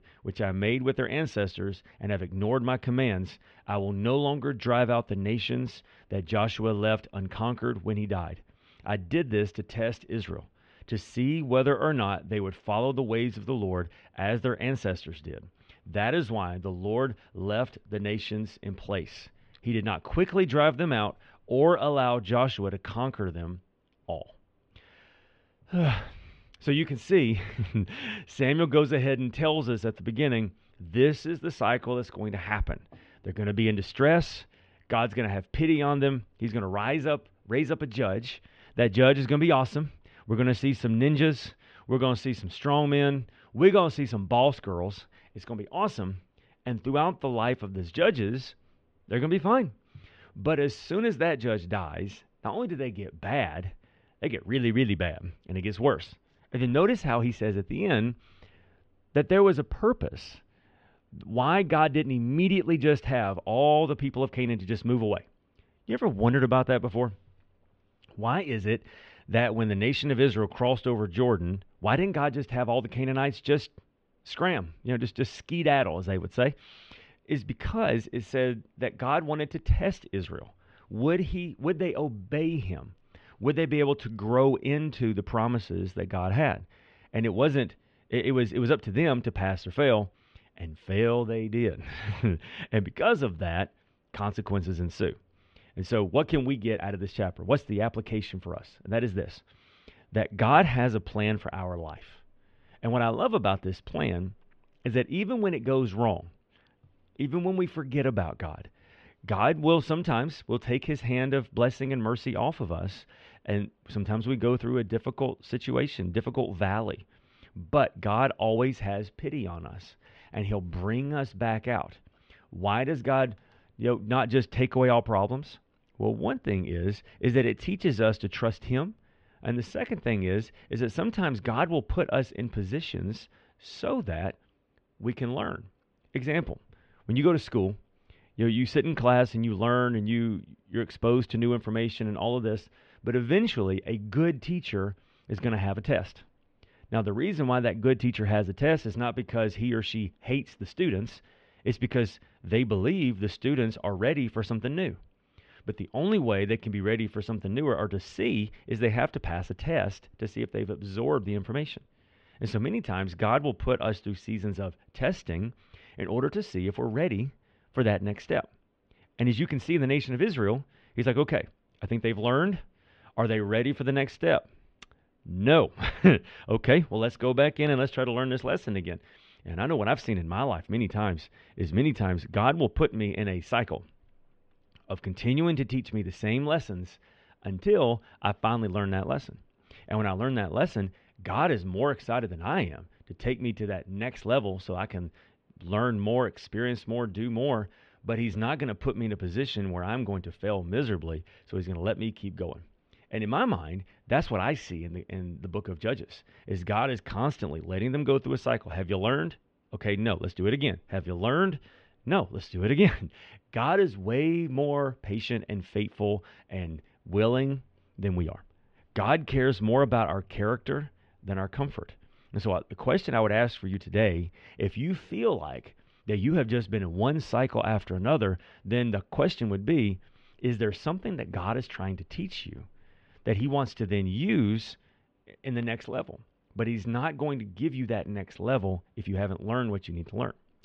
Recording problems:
muffled; very; fading above 3 kHz

